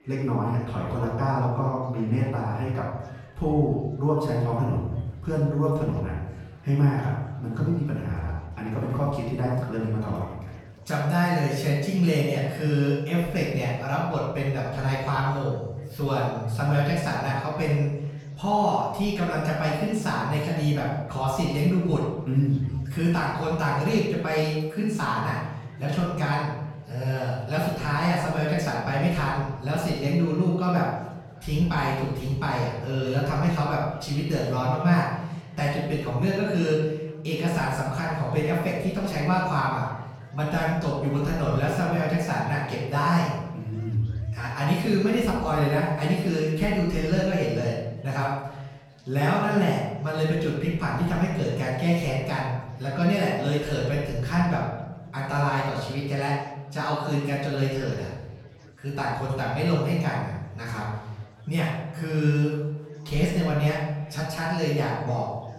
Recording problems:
off-mic speech; far
room echo; noticeable; dies away in 1 s
chatter from many people; faint; throughout; 30 dB below the speech

